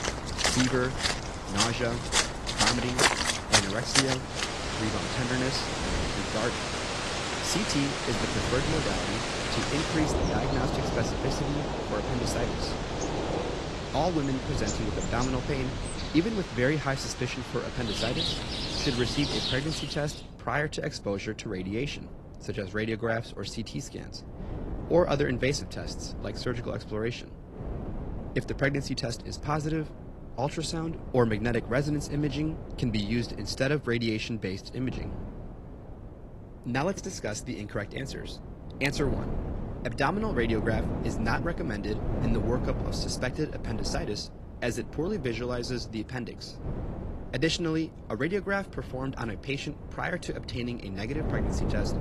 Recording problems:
garbled, watery; slightly; nothing above 12 kHz
rain or running water; very loud; until 20 s; 1 dB above the speech
wind noise on the microphone; occasional gusts; 10 dB below the speech

